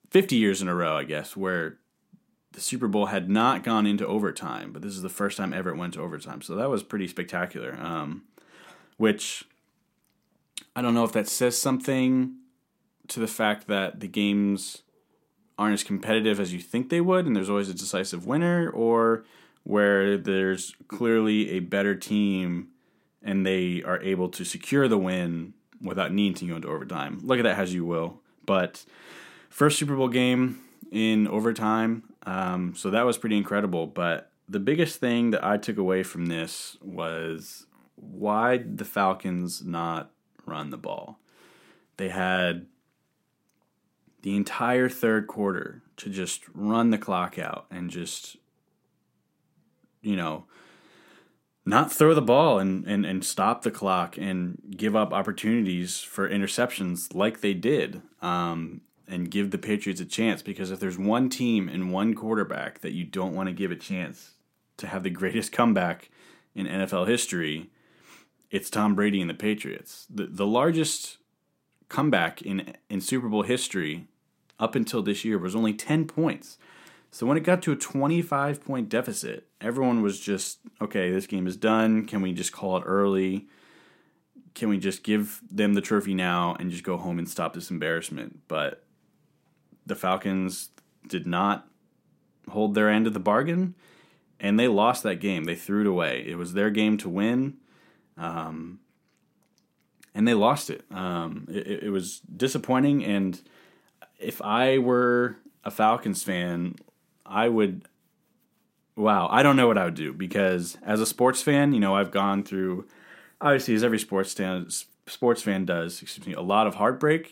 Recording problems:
none

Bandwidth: 16 kHz